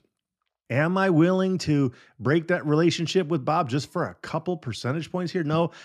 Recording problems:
none

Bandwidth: 15 kHz